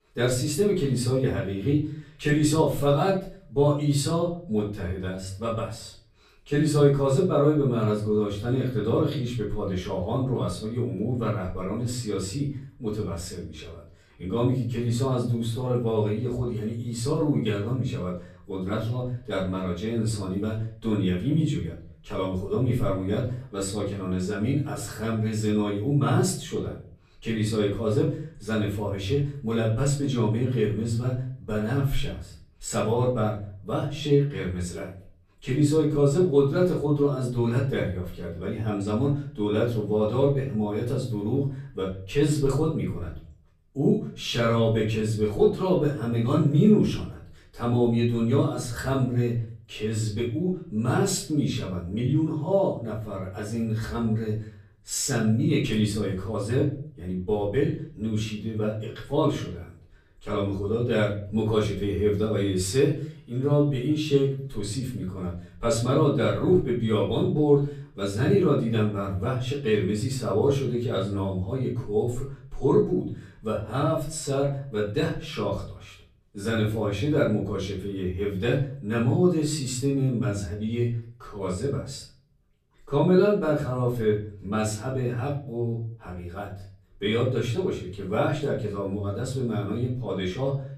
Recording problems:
off-mic speech; far
room echo; slight; dies away in 0.5 s

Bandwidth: 14.5 kHz